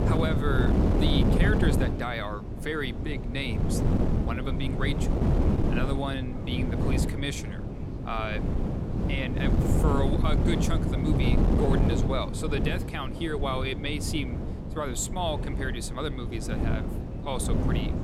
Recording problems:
wind noise on the microphone; heavy; 2 dB below the speech
chatter from many people; faint; throughout; 25 dB below the speech

